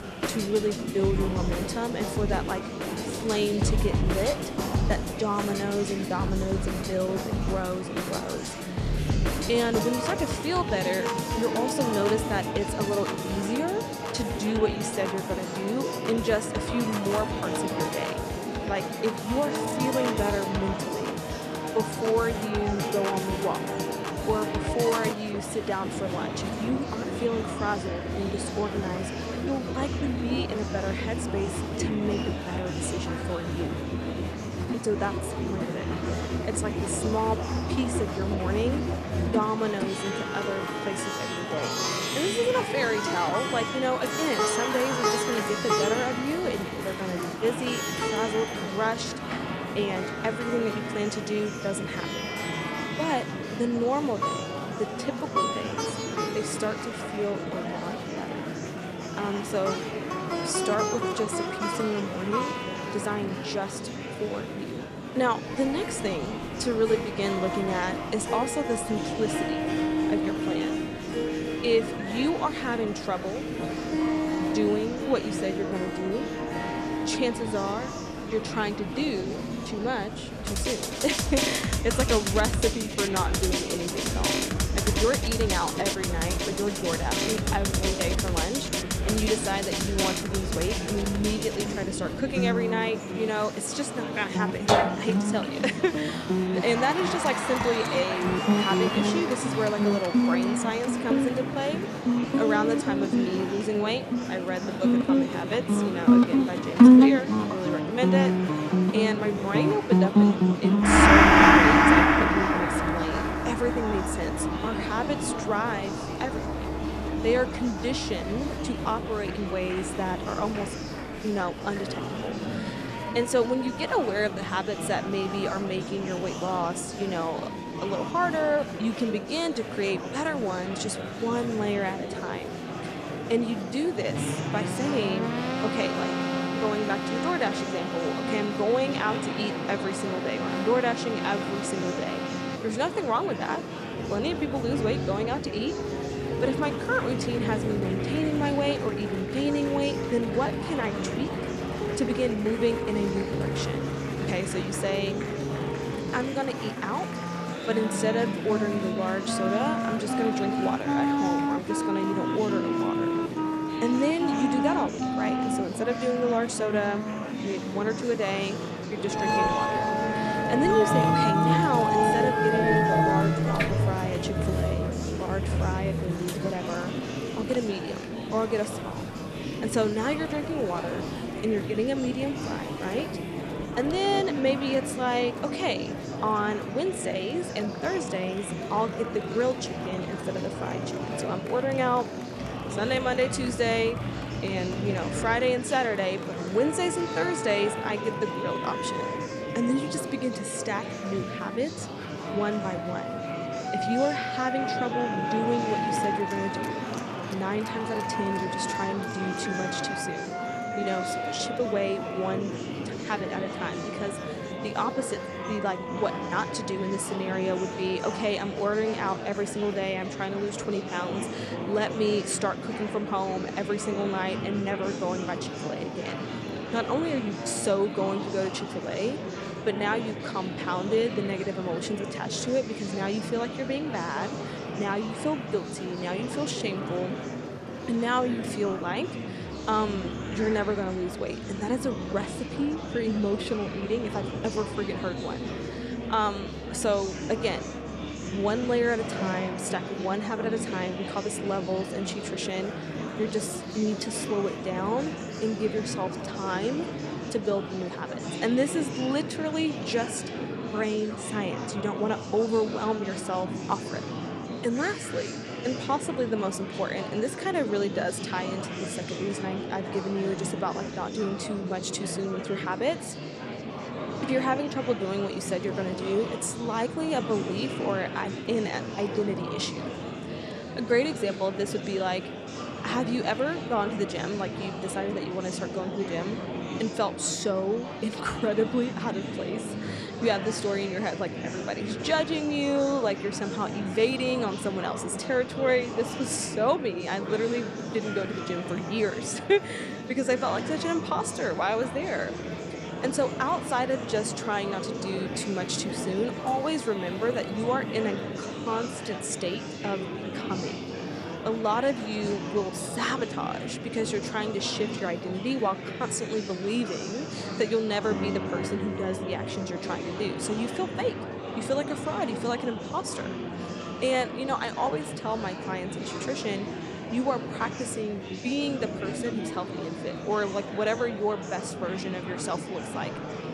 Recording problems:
background music; very loud; throughout; 1 dB above the speech
murmuring crowd; loud; throughout; 5 dB below the speech

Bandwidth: 14 kHz